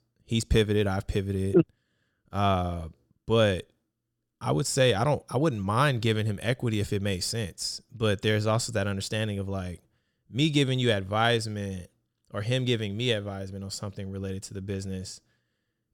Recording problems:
none

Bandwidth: 17.5 kHz